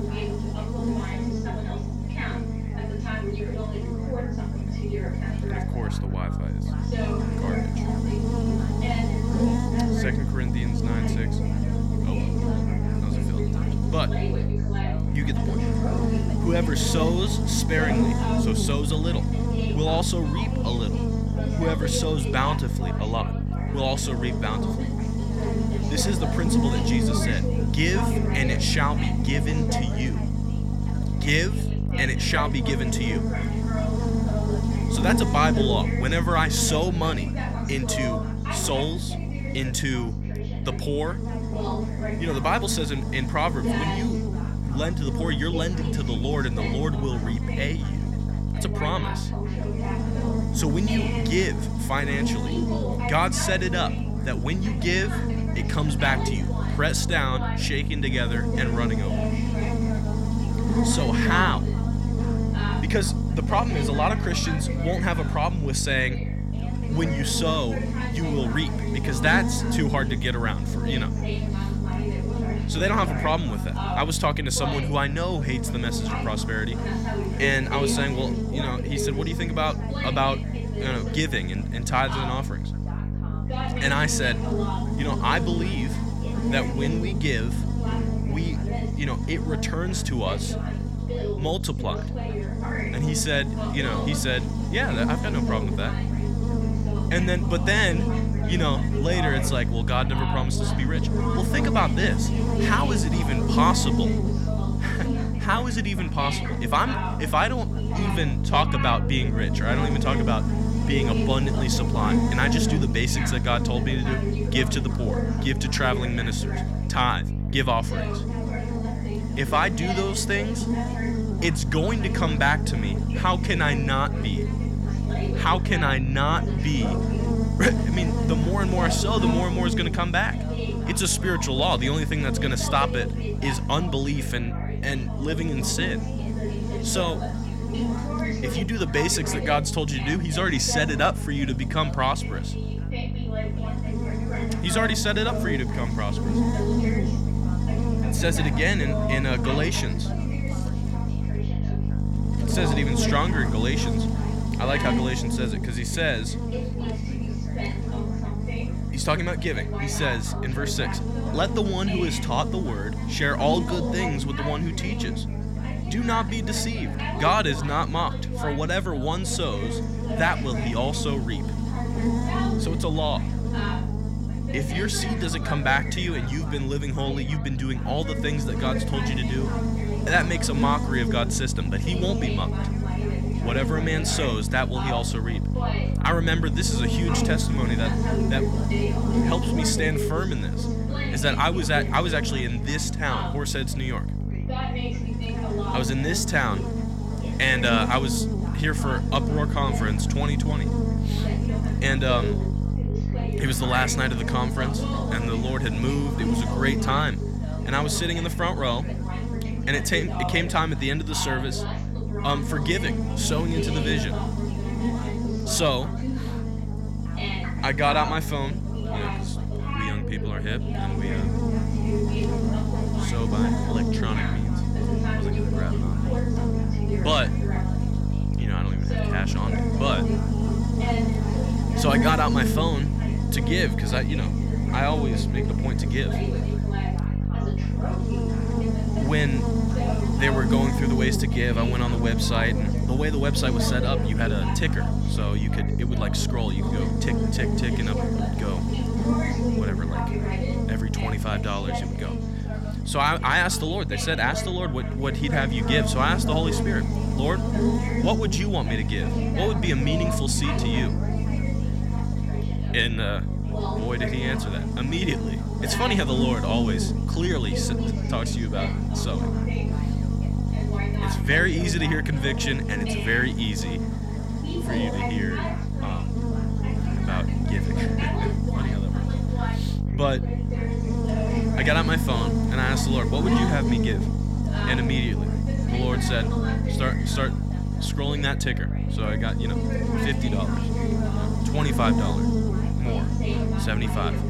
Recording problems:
electrical hum; loud; throughout; 50 Hz, 8 dB below the speech
background chatter; loud; throughout; 3 voices, 9 dB below the speech

